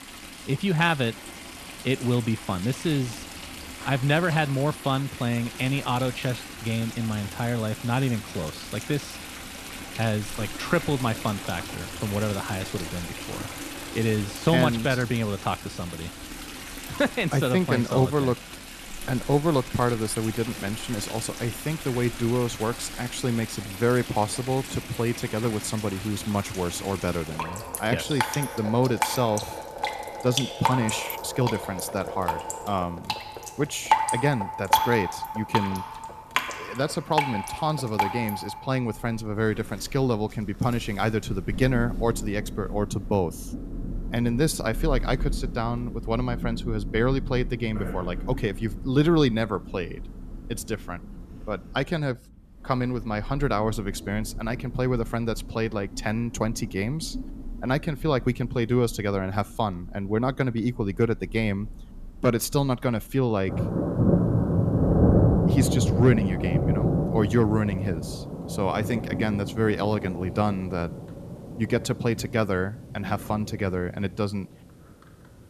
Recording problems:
rain or running water; loud; throughout; 5 dB below the speech

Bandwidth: 14 kHz